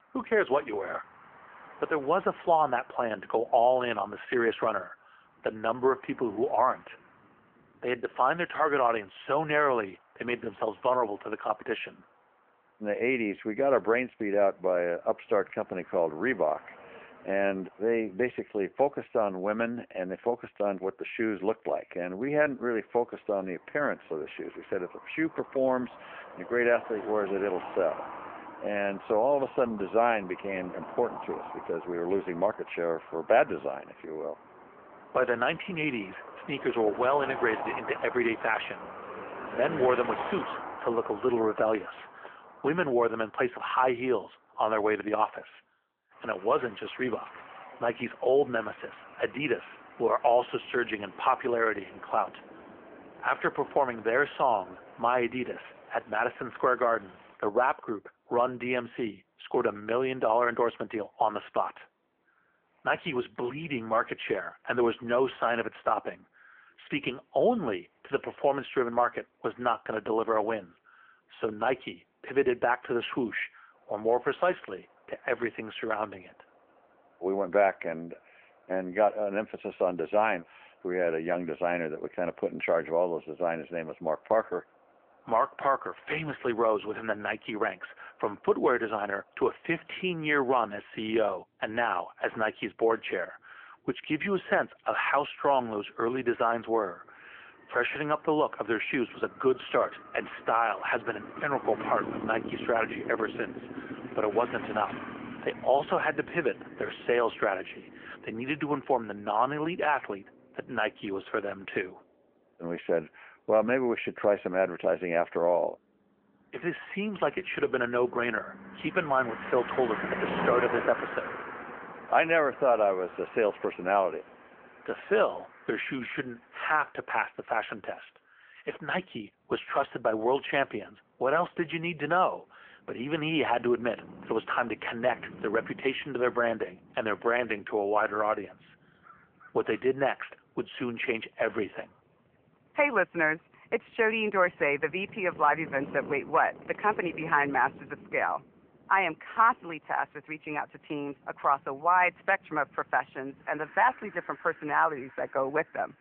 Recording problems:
phone-call audio
traffic noise; noticeable; throughout; 15 dB below the speech

